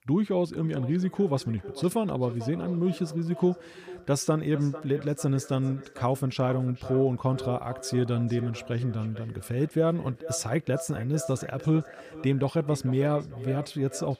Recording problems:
echo of what is said; noticeable; throughout; 450 ms later, 15 dB below the speech

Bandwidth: 15 kHz